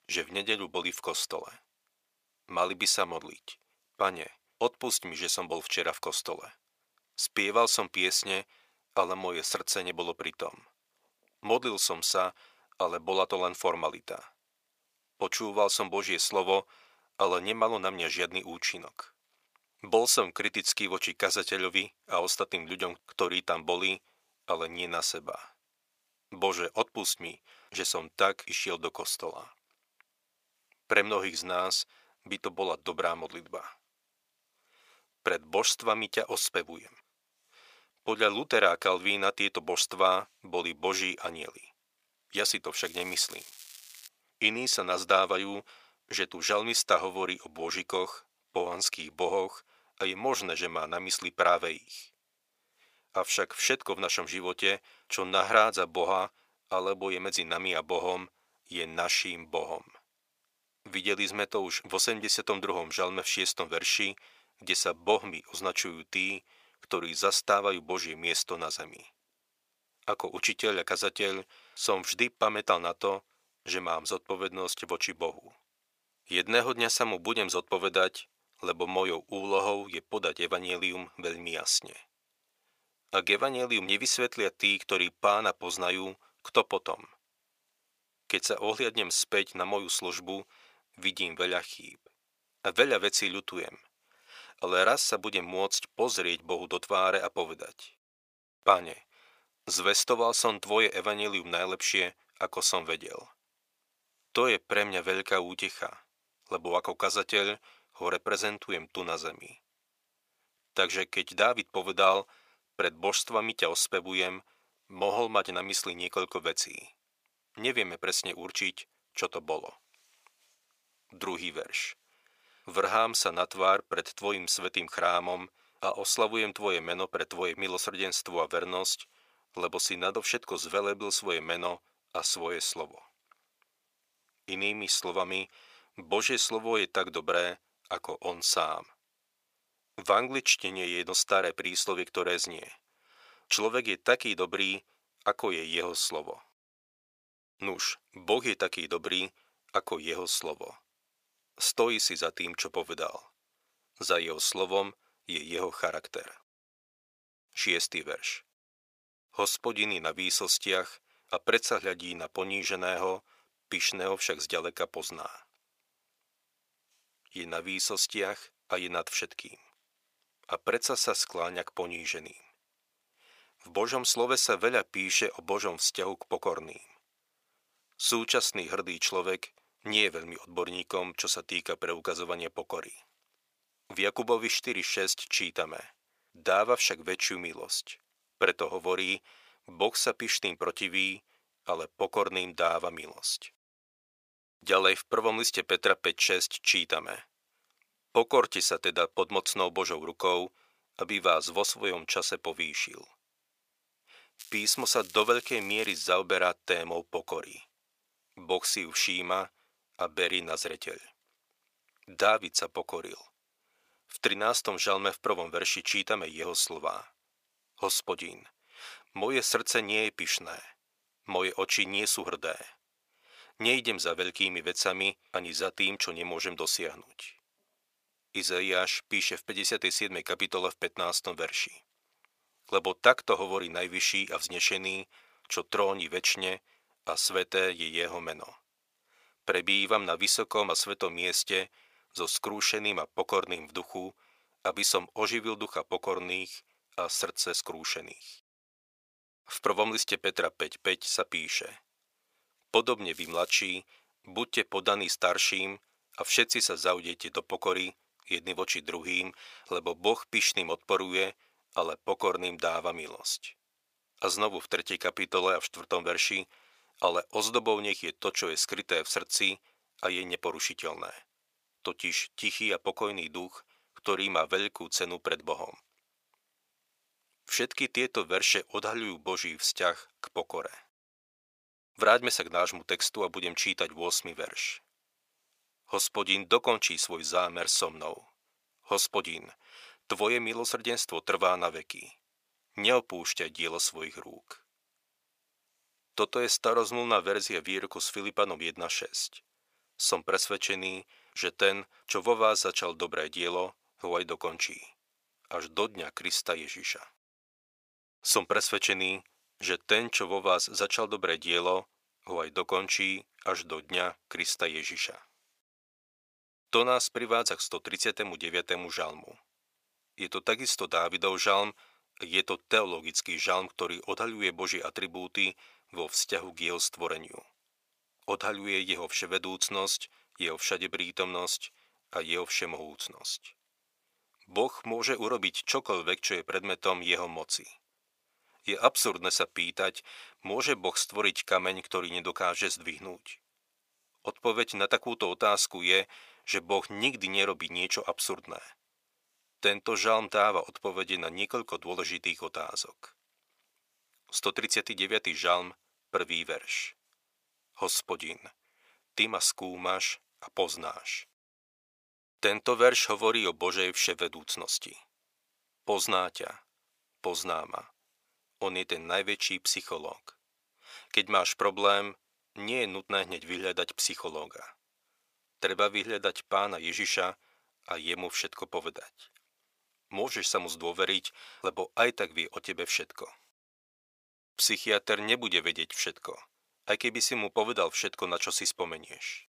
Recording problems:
thin; very; fading below 600 Hz
crackling; noticeable; from 43 to 44 s, from 3:24 to 3:26 and at 4:13; 20 dB below the speech

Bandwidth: 15 kHz